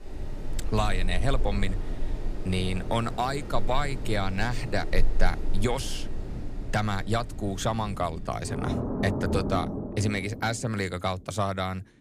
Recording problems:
rain or running water; loud; throughout; 5 dB below the speech

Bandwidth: 15 kHz